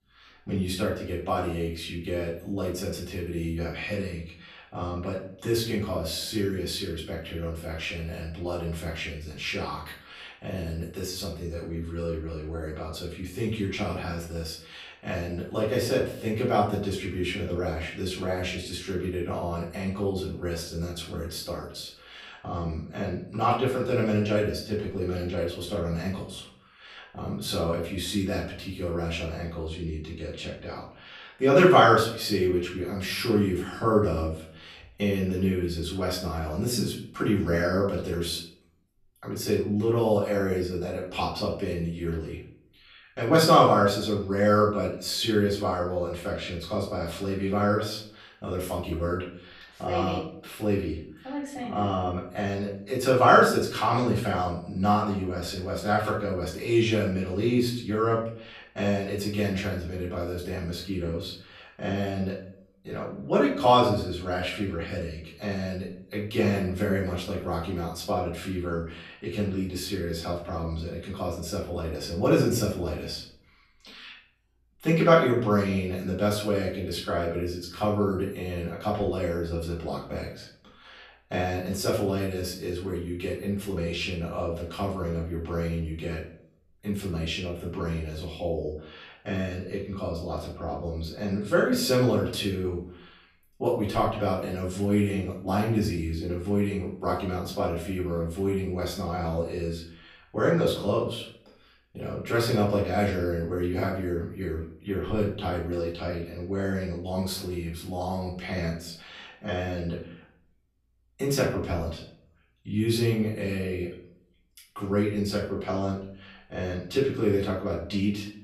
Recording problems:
off-mic speech; far
room echo; noticeable; dies away in 0.5 s

